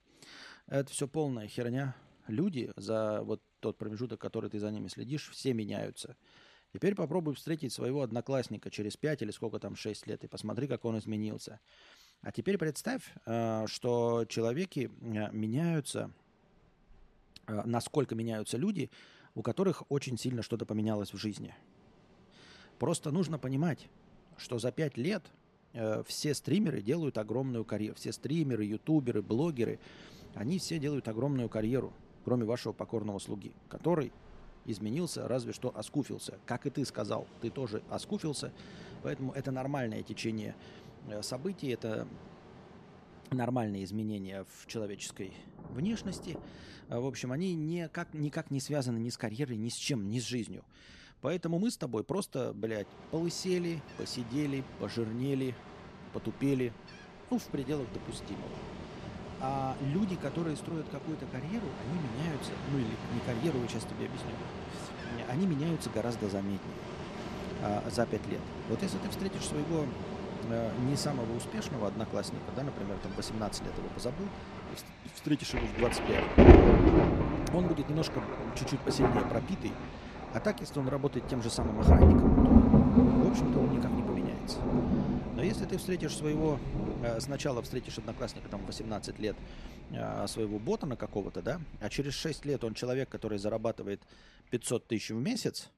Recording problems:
rain or running water; very loud; throughout; 5 dB above the speech

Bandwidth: 14 kHz